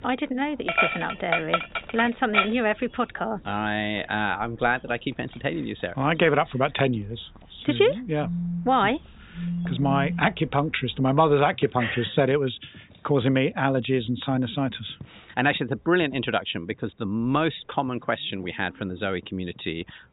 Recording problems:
high frequencies cut off; severe; nothing above 4 kHz
animal sounds; loud; throughout; 2 dB below the speech
phone ringing; noticeable; from 8 to 10 s; peak 4 dB below the speech

